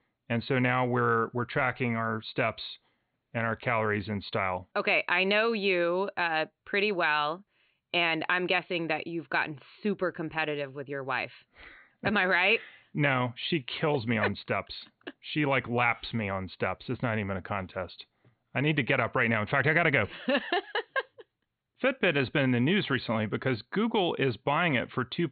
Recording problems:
high frequencies cut off; severe; nothing above 4.5 kHz

